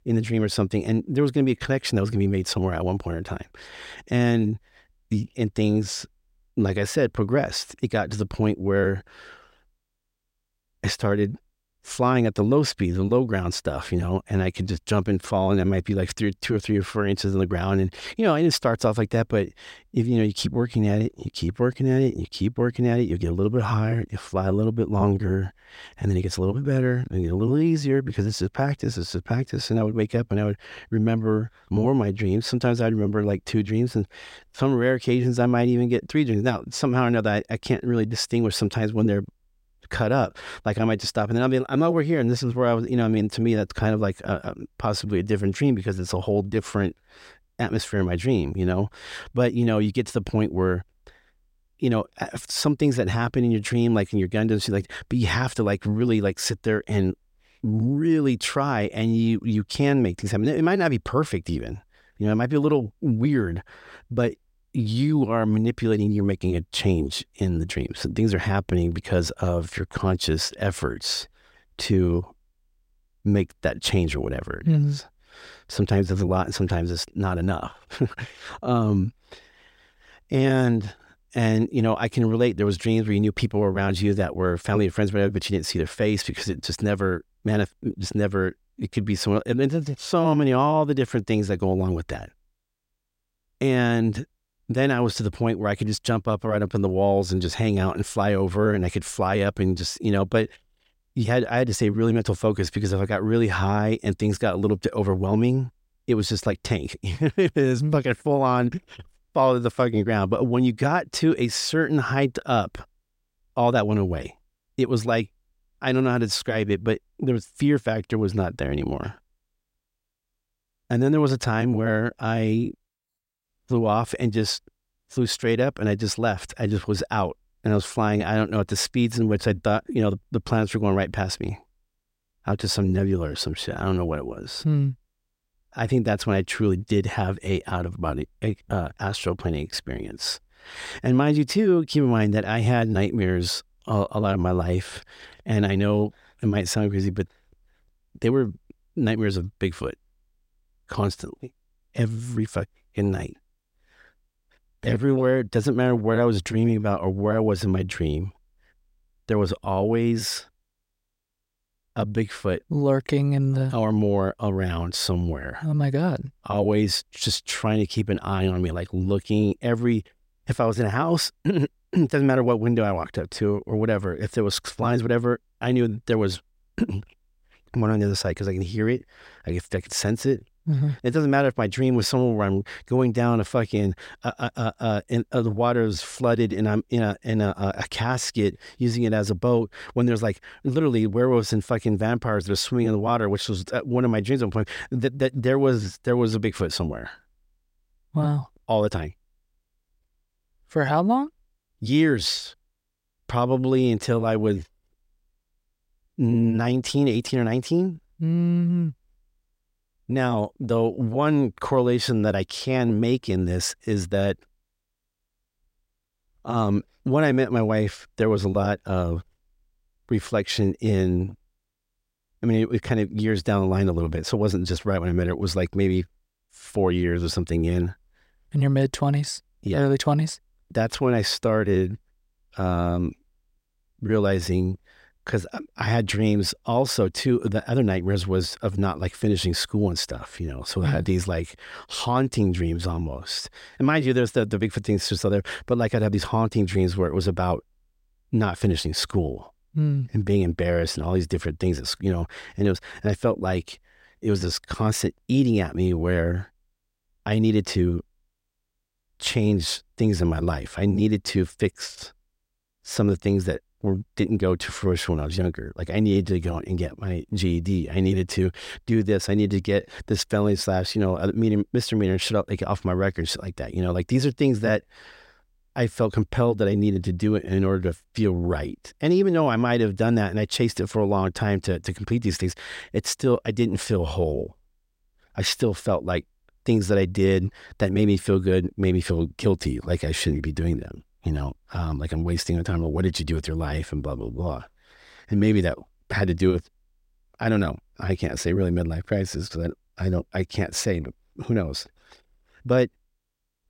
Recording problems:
none

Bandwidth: 16 kHz